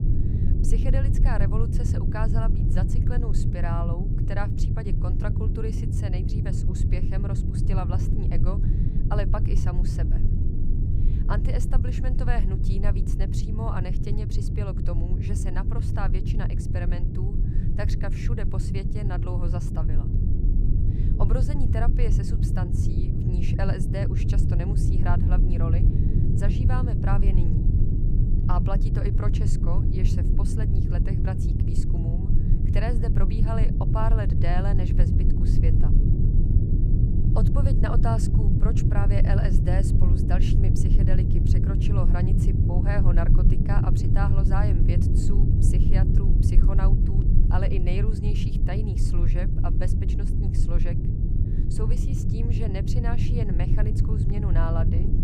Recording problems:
low rumble; loud; throughout; 1 dB below the speech

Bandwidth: 15 kHz